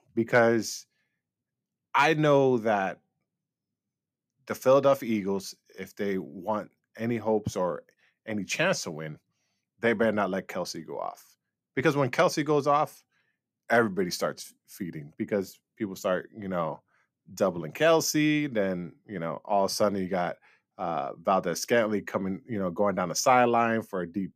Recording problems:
none

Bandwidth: 14.5 kHz